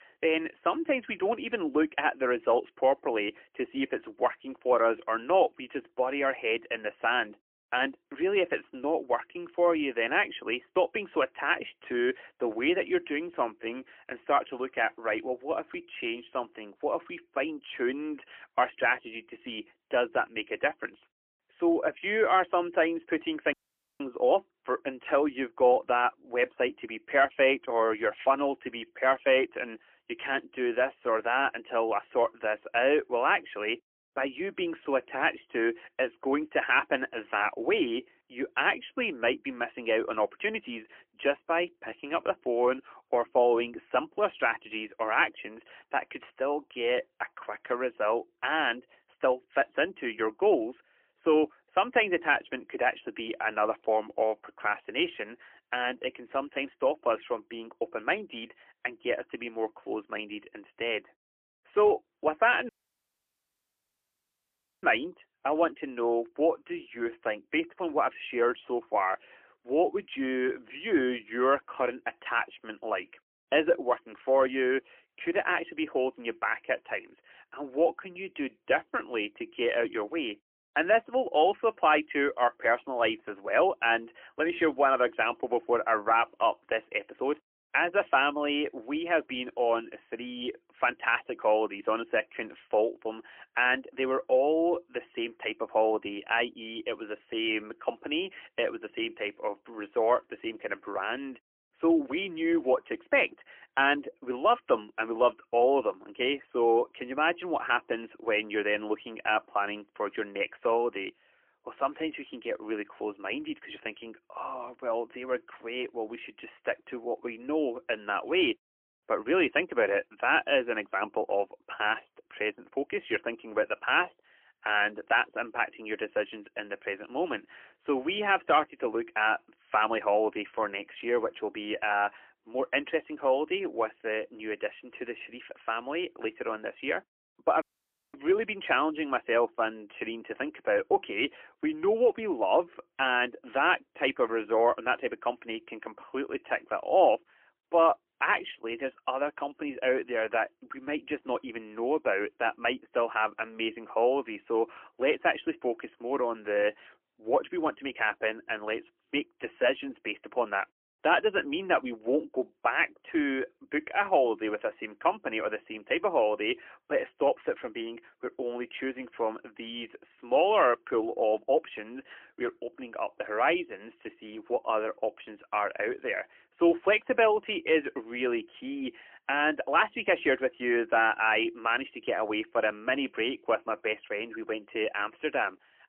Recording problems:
phone-call audio; poor line; nothing above 3 kHz
audio cutting out; at 24 s, at 1:03 for 2 s and at 2:18 for 0.5 s

